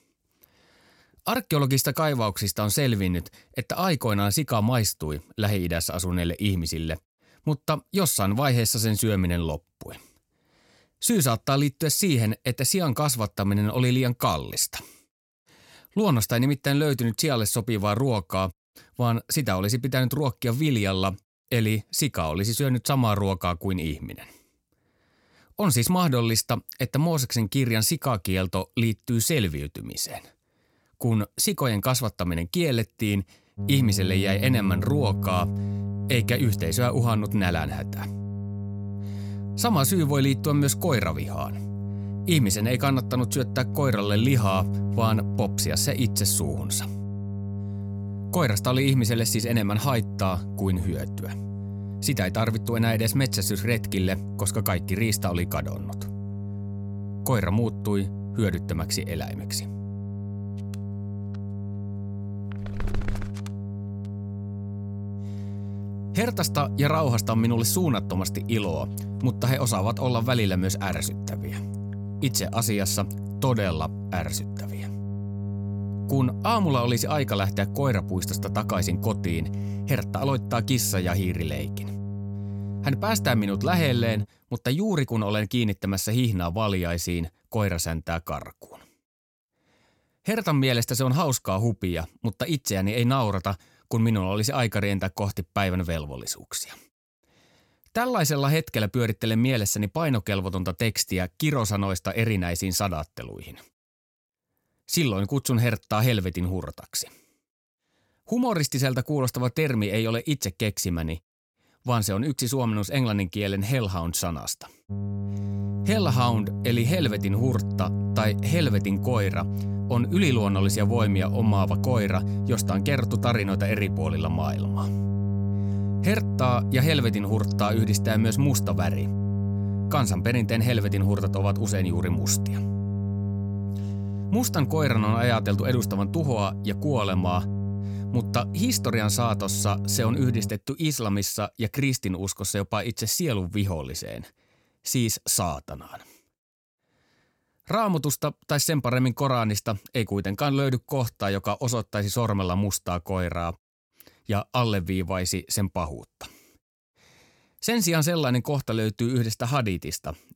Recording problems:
electrical hum; noticeable; from 34 s to 1:24 and from 1:55 to 2:20; 50 Hz, 10 dB below the speech

